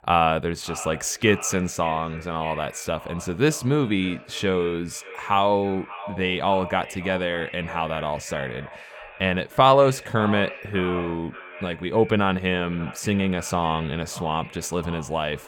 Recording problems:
echo of what is said; noticeable; throughout; 580 ms later, 15 dB below the speech

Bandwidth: 18 kHz